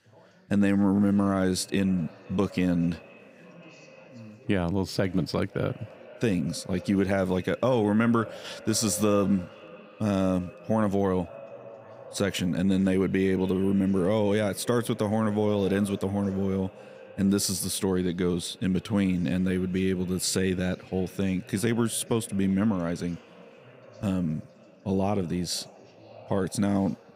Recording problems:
echo of what is said; faint; throughout; 520 ms later, 20 dB below the speech
background chatter; faint; throughout; 3 voices, 30 dB below the speech

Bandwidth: 15.5 kHz